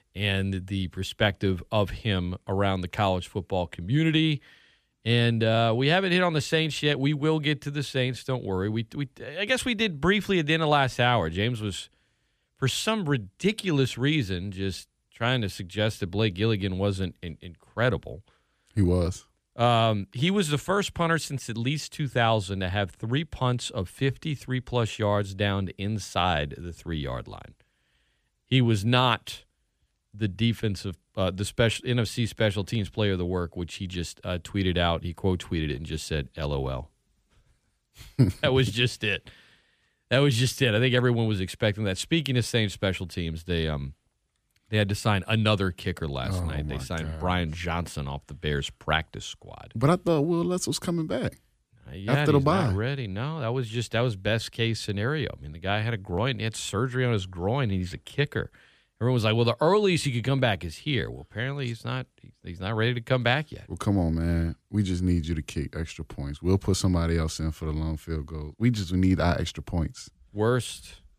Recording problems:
none

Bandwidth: 15 kHz